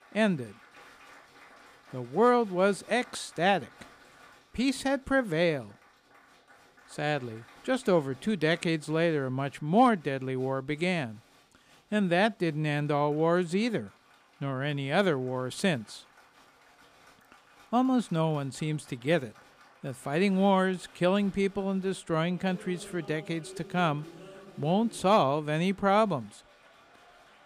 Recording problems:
crowd noise; faint; throughout; 25 dB below the speech

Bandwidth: 15 kHz